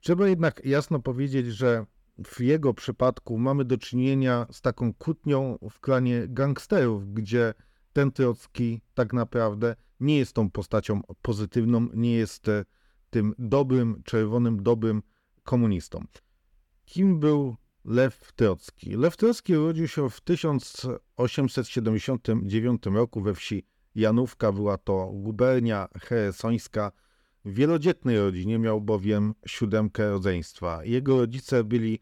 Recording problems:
none

